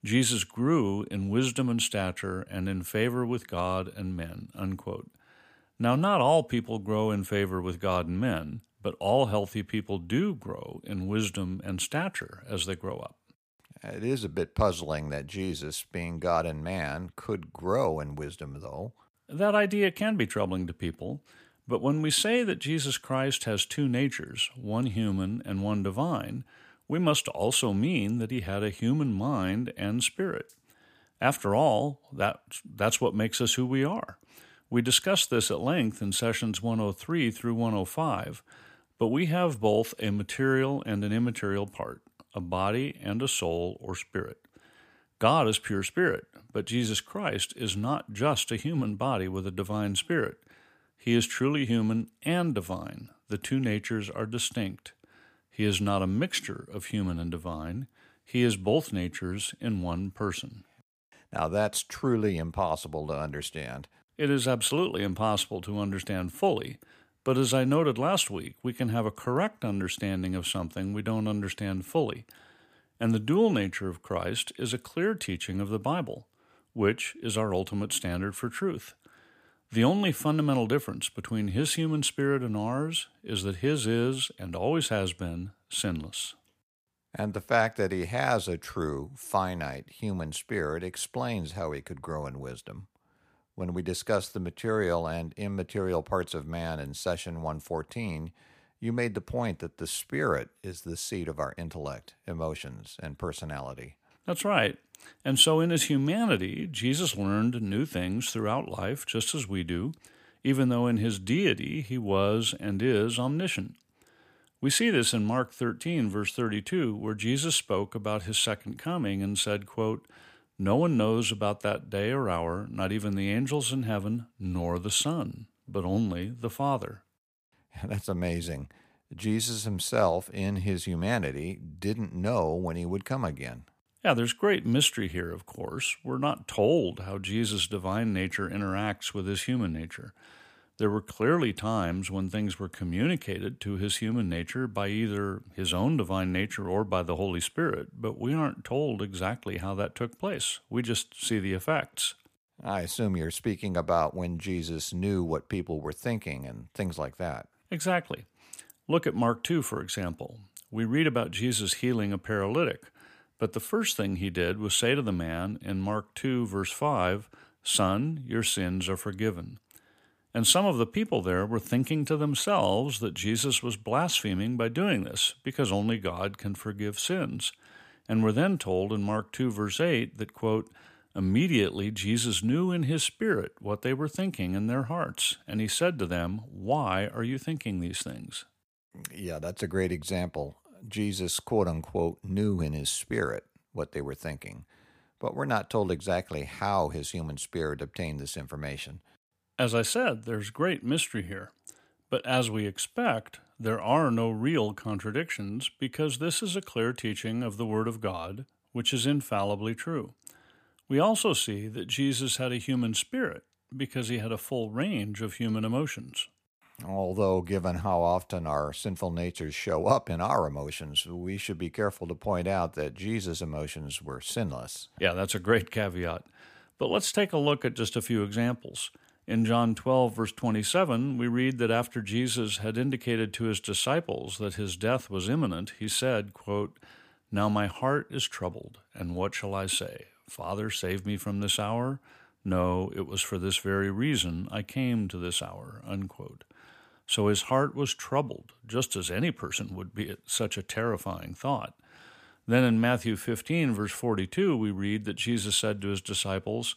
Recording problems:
none

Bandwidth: 15 kHz